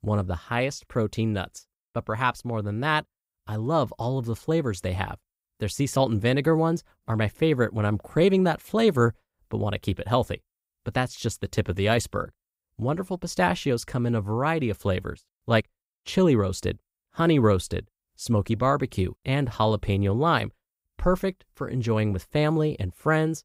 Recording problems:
none

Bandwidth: 15.5 kHz